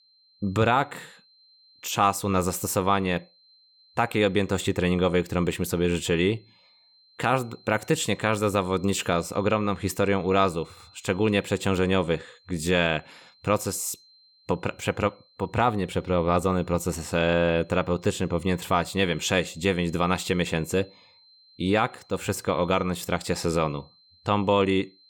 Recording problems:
high-pitched whine; faint; throughout; 4 kHz, 30 dB below the speech

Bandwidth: 18.5 kHz